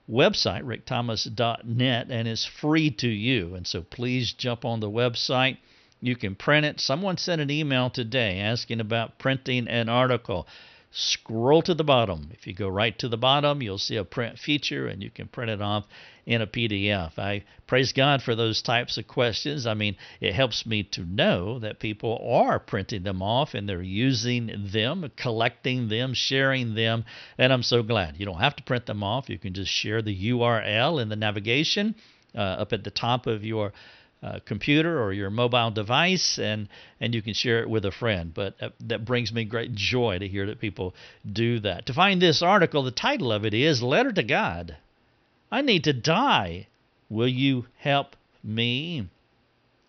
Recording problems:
high frequencies cut off; noticeable; nothing above 6 kHz

